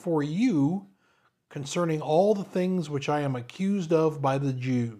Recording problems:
none

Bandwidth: 15 kHz